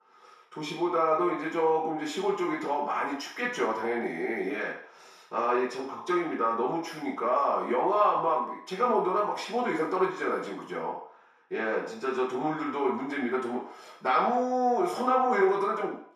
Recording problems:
off-mic speech; far
room echo; noticeable; dies away in 0.6 s

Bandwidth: 14 kHz